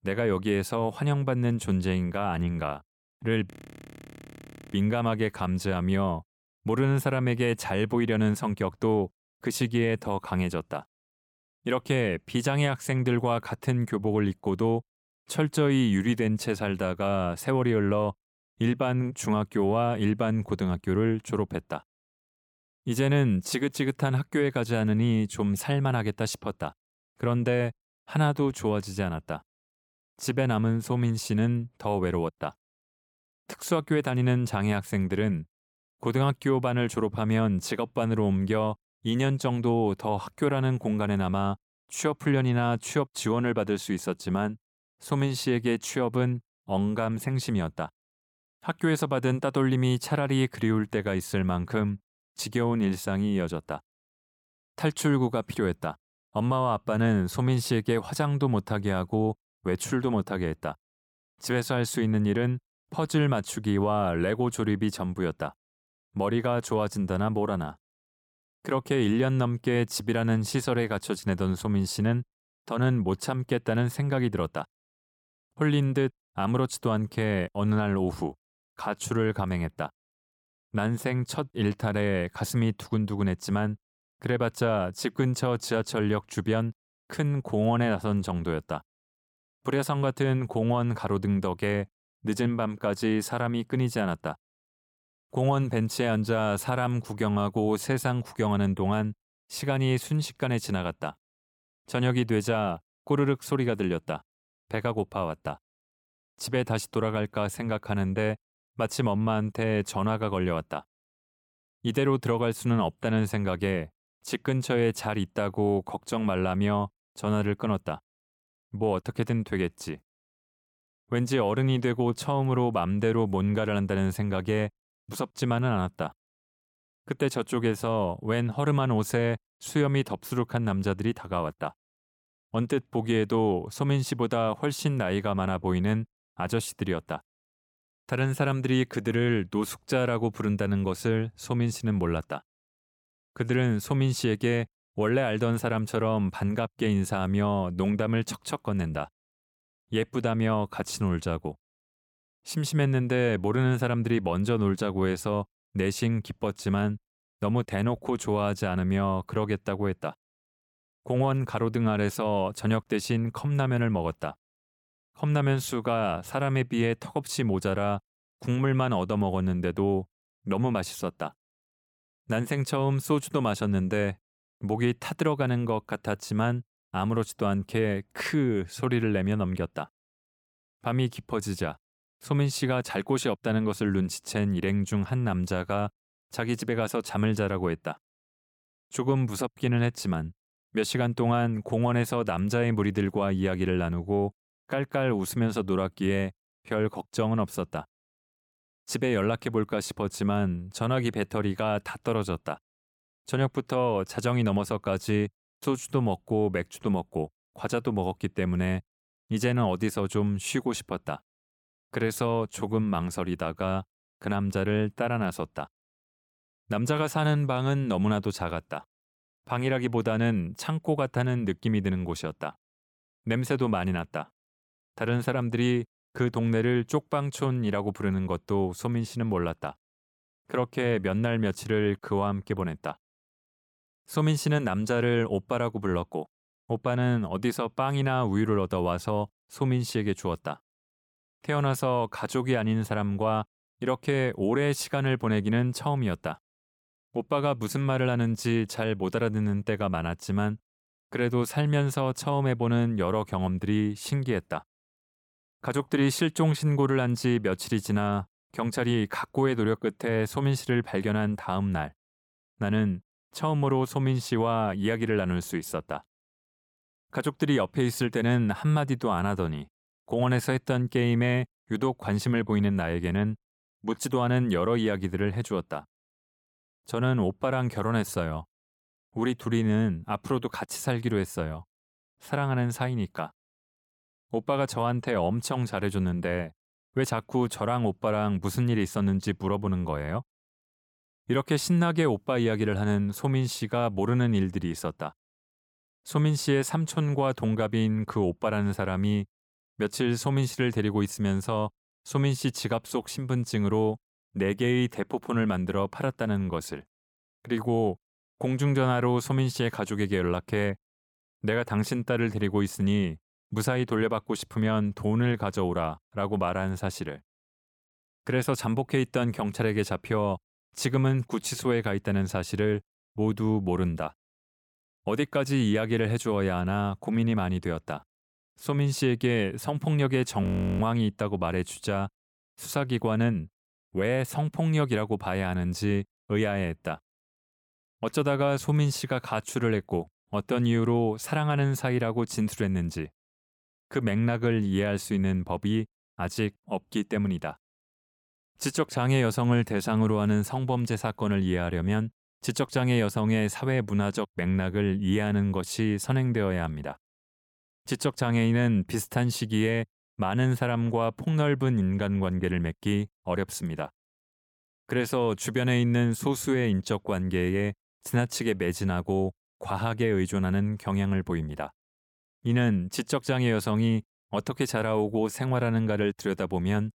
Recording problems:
audio freezing; at 3.5 s for 1 s and at 5:30

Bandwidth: 17.5 kHz